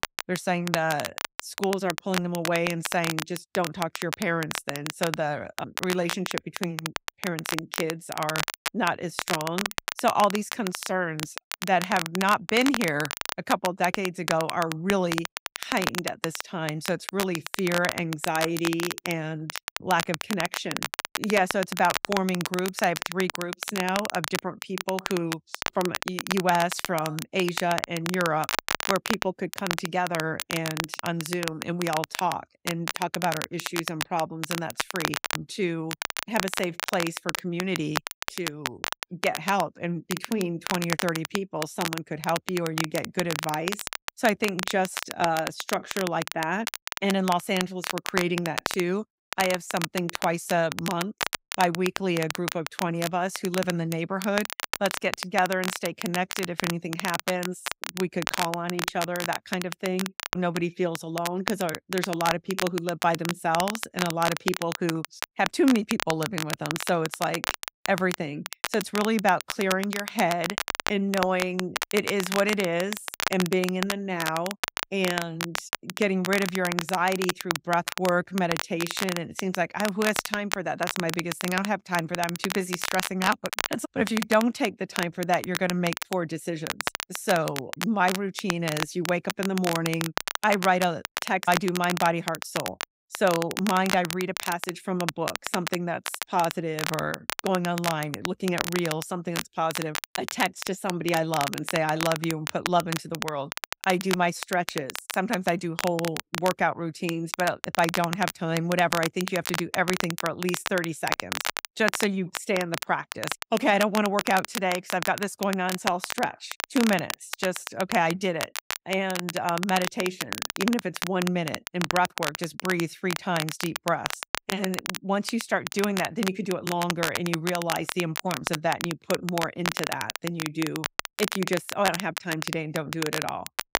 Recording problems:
crackle, like an old record; loud; 4 dB below the speech

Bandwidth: 15.5 kHz